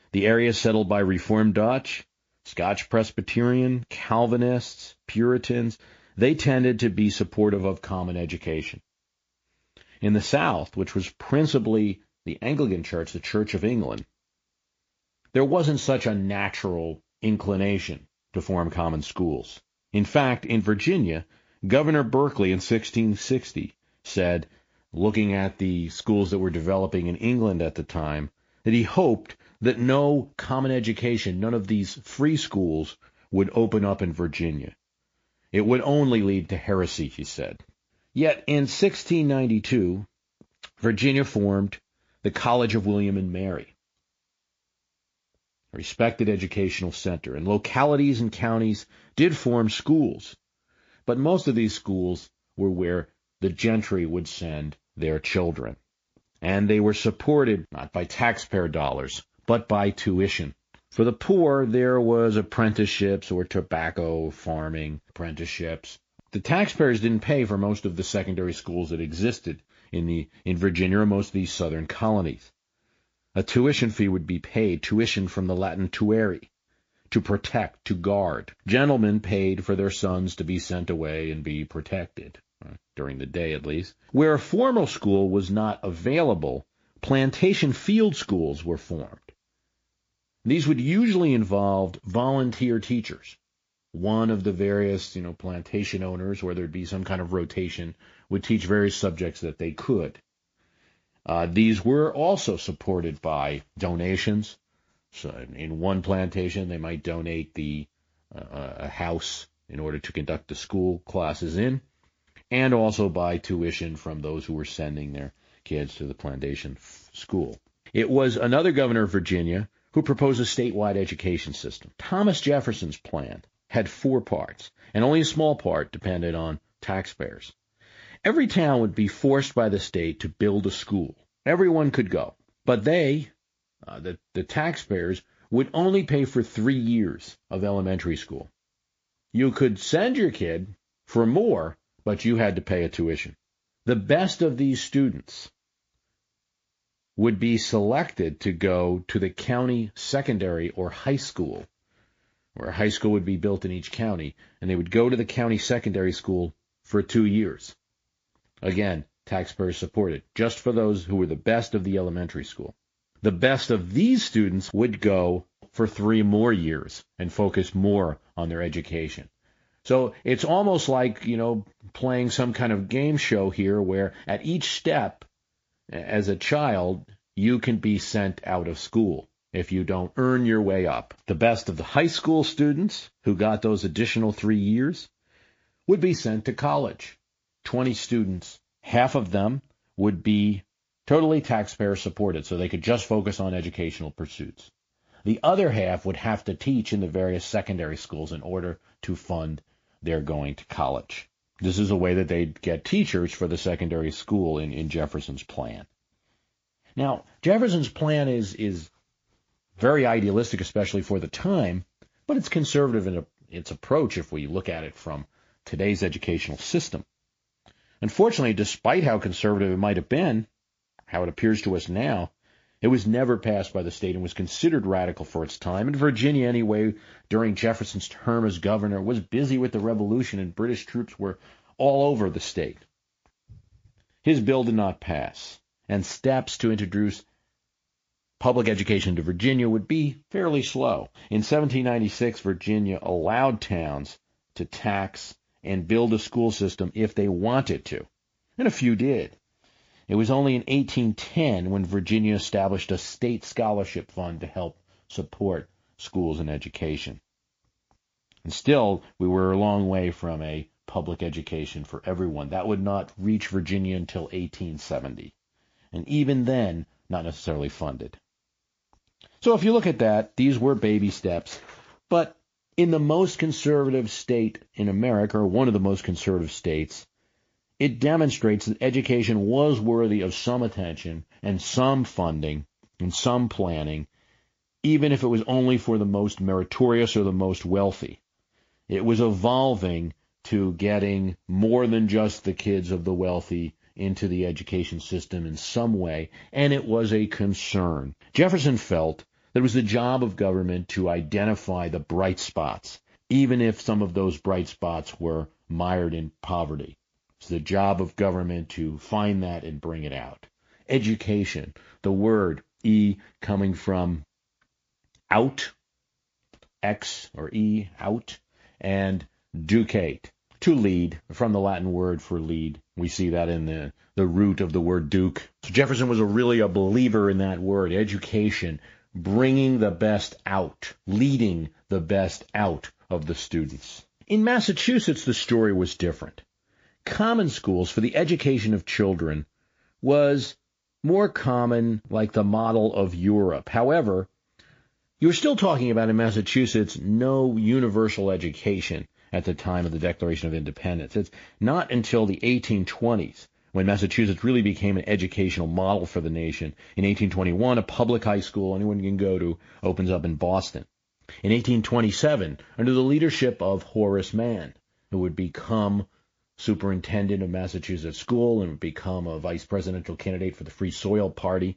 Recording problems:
garbled, watery; slightly; nothing above 7.5 kHz

